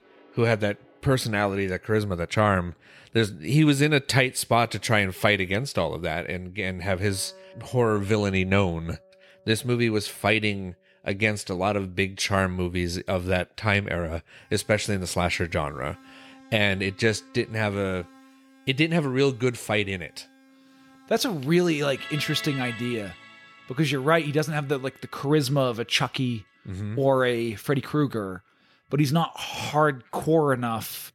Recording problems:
background music; faint; throughout; 20 dB below the speech

